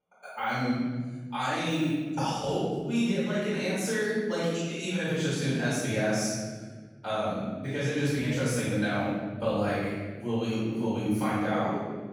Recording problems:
room echo; strong; dies away in 1.5 s
off-mic speech; far

